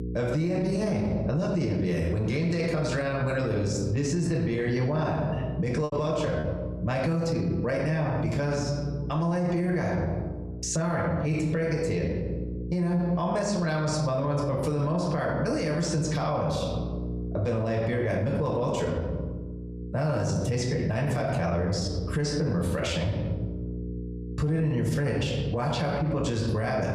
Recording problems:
room echo; slight; dies away in 0.9 s
off-mic speech; somewhat distant
squashed, flat; somewhat
electrical hum; noticeable; throughout; 60 Hz, 20 dB below the speech
choppy; occasionally; at 6 s; 5% of the speech affected

